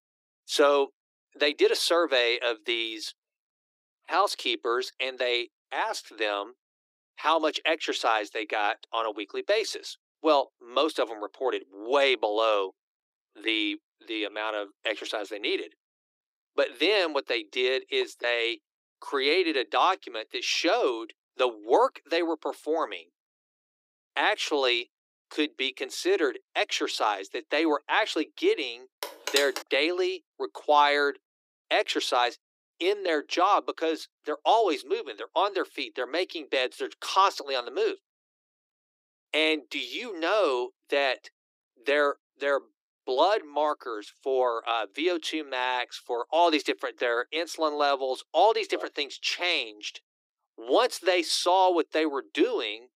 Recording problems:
thin; very; fading below 300 Hz
phone ringing; noticeable; at 29 s; peak 2 dB below the speech

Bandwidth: 15.5 kHz